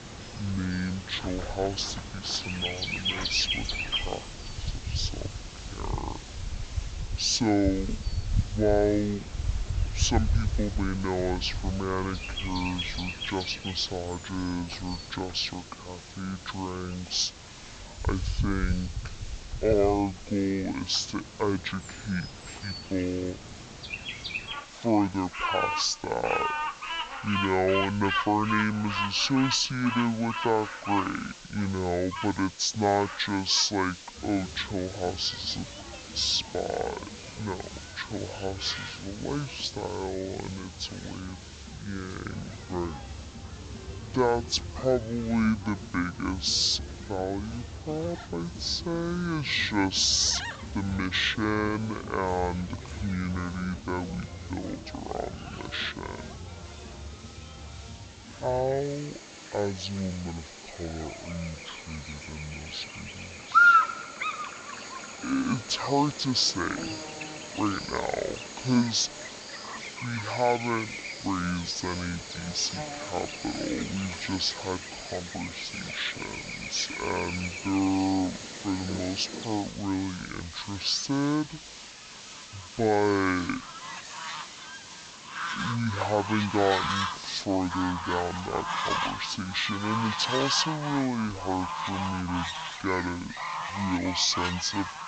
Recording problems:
wrong speed and pitch; too slow and too low; 0.5 times normal speed
high frequencies cut off; noticeable; nothing above 8 kHz
animal sounds; loud; throughout; 5 dB below the speech
hiss; noticeable; throughout; 15 dB below the speech

